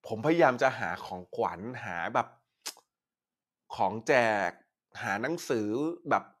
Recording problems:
none

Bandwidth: 13.5 kHz